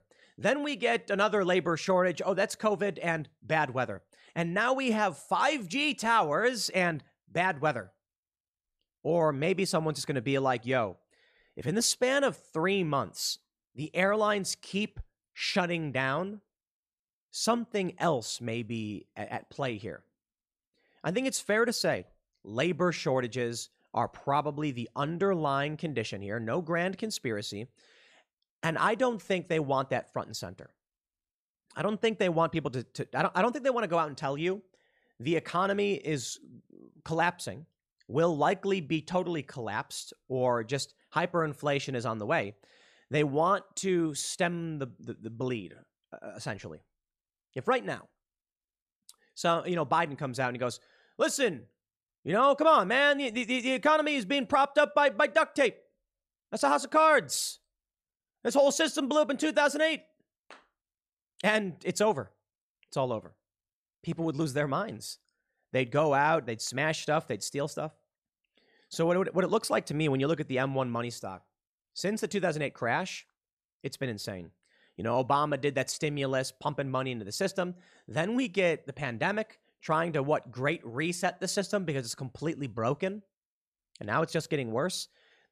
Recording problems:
none

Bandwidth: 14 kHz